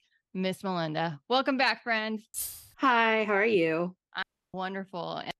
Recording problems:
jangling keys; noticeable; at 2.5 s; peak 7 dB below the speech
audio cutting out; at 4 s

